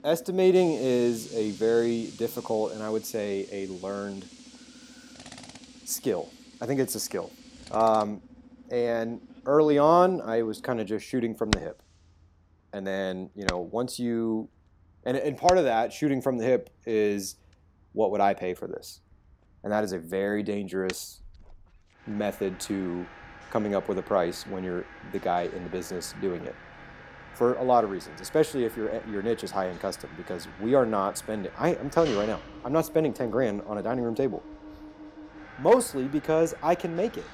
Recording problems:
machinery noise; noticeable; throughout; 15 dB below the speech

